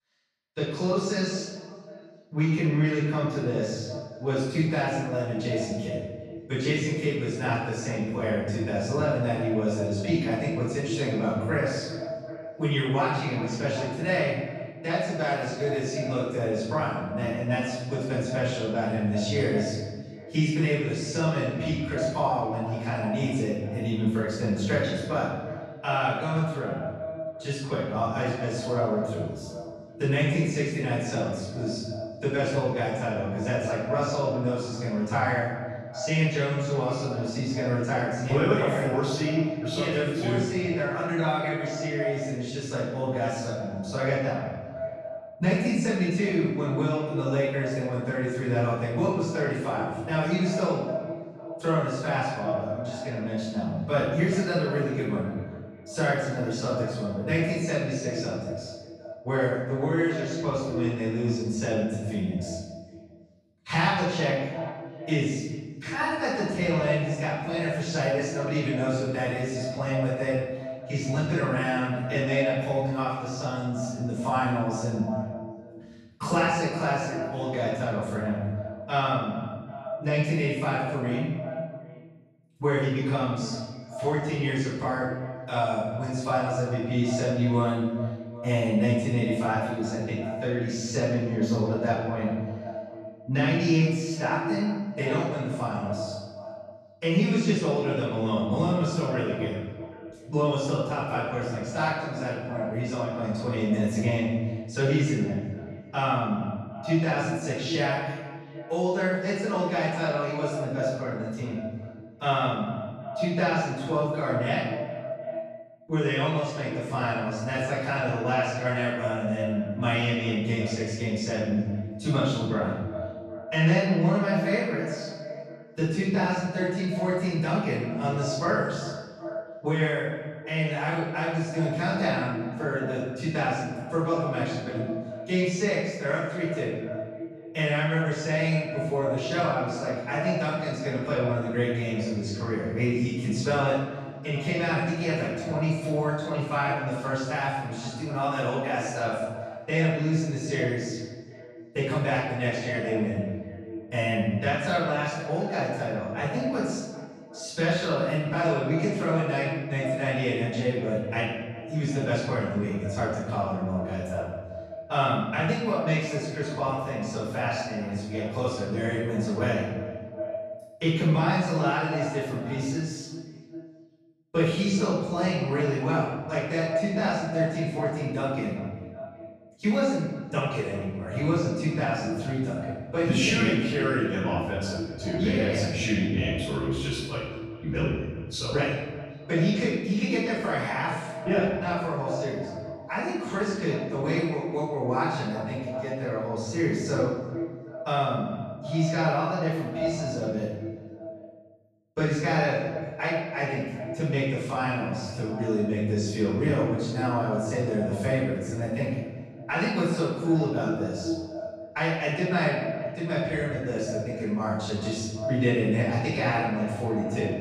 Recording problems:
echo of what is said; strong; throughout; 380 ms later, 10 dB below the speech
room echo; strong; dies away in 1 s
off-mic speech; far

